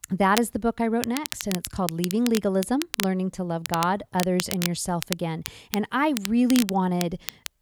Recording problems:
crackle, like an old record; loud; 8 dB below the speech

